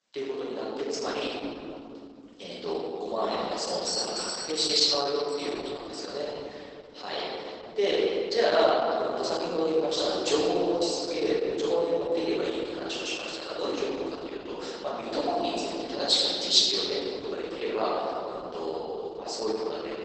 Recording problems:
room echo; strong; dies away in 2.8 s
off-mic speech; far
garbled, watery; badly; nothing above 8 kHz
thin; very; fading below 350 Hz
doorbell; noticeable; from 4 to 5.5 s; peak 1 dB below the speech

